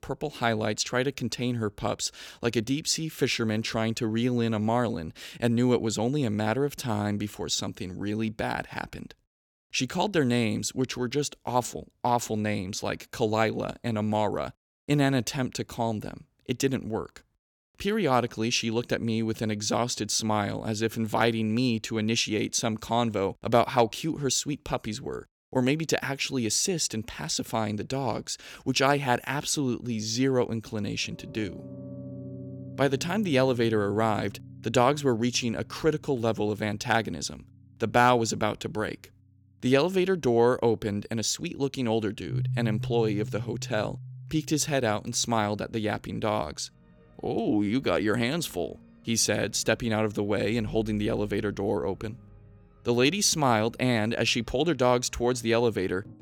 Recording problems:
background music; noticeable; from 32 s on; 15 dB below the speech

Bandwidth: 18 kHz